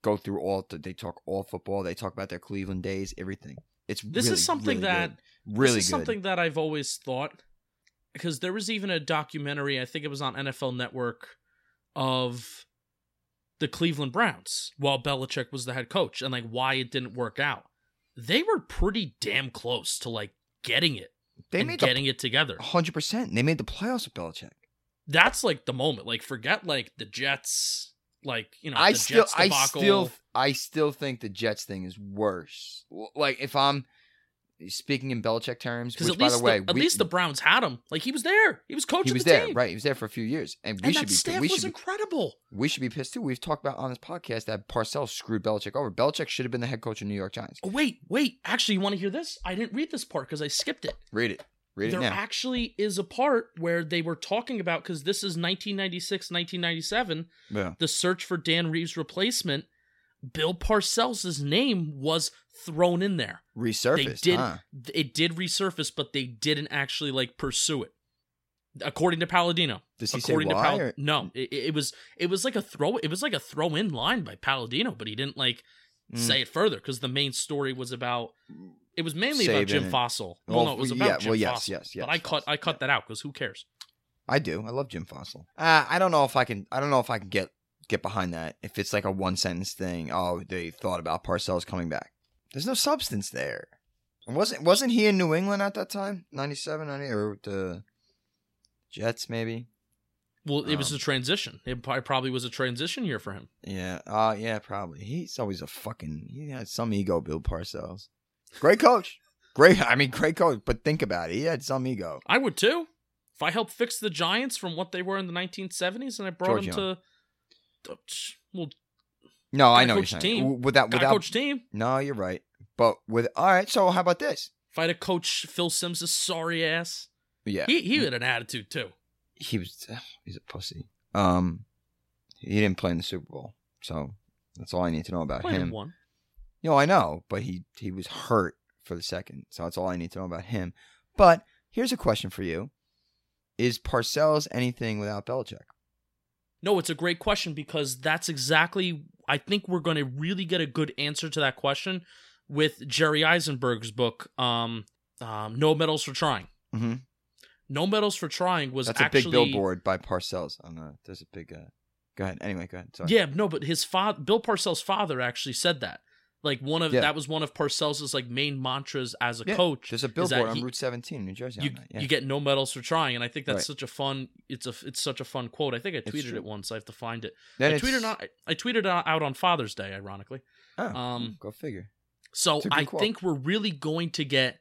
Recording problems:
none

